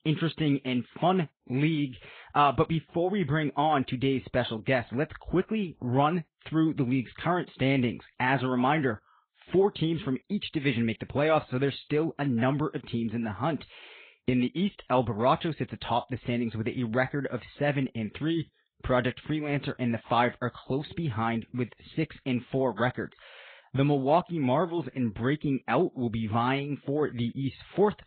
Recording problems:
high frequencies cut off; severe; nothing above 4 kHz
garbled, watery; slightly

